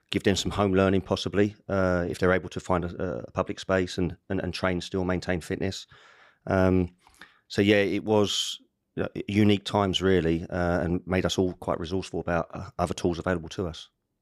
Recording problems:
none

